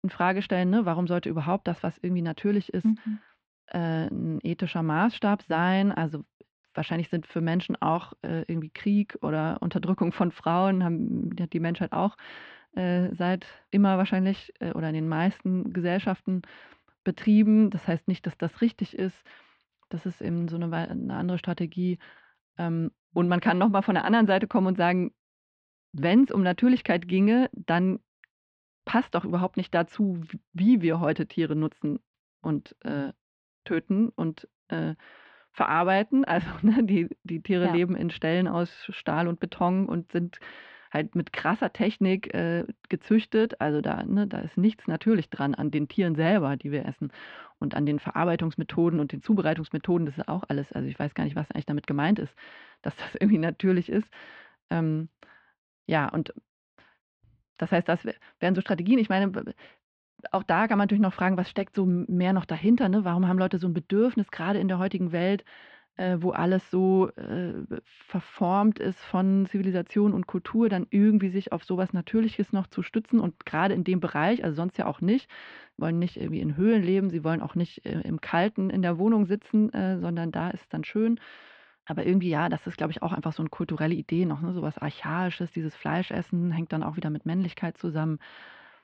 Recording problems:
muffled; slightly; fading above 3.5 kHz

